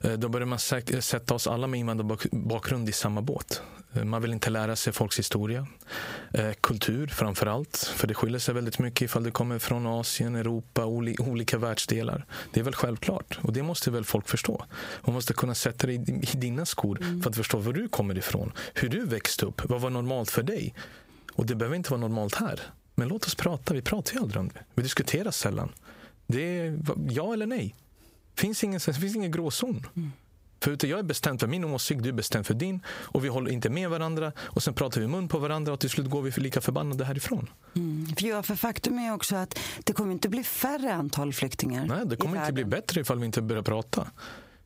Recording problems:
squashed, flat; heavily

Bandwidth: 15.5 kHz